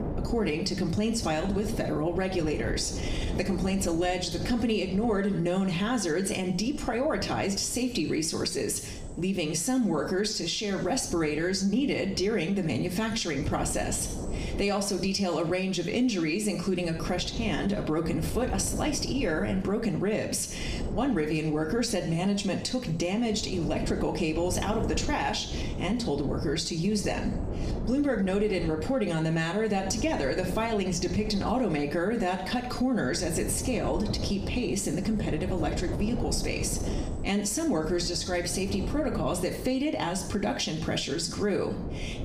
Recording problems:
room echo; very slight; dies away in 0.5 s
off-mic speech; somewhat distant
squashed, flat; somewhat
wind noise on the microphone; occasional gusts; 15 dB below the speech

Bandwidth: 15 kHz